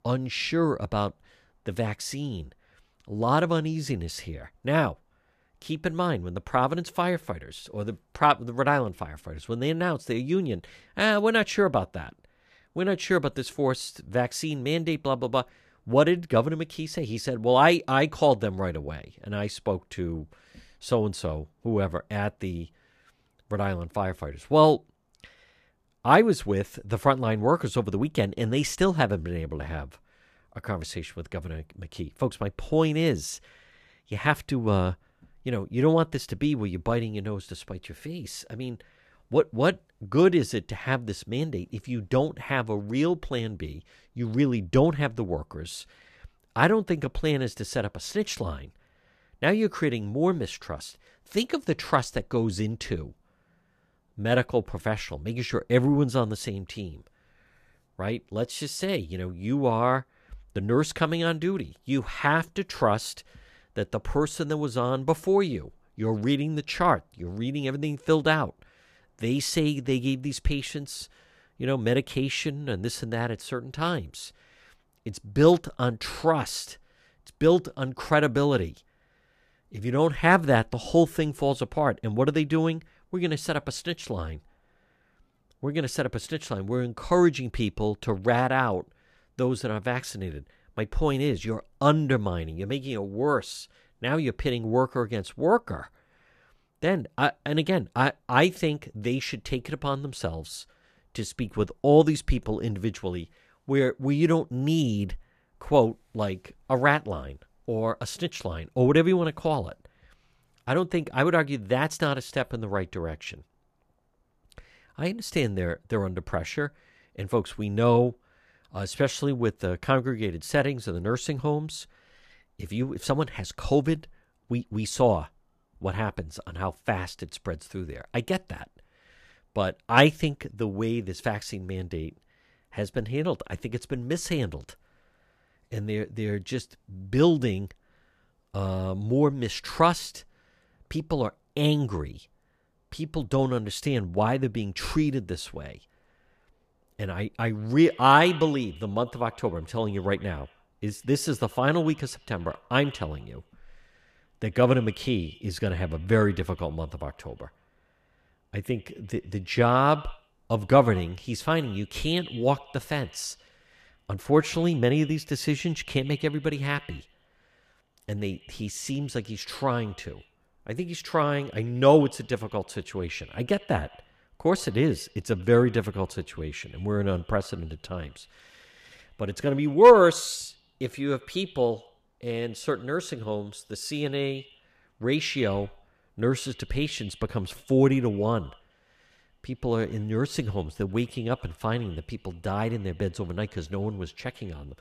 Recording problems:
echo of what is said; faint; from 2:28 on; 90 ms later, 20 dB below the speech

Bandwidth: 14.5 kHz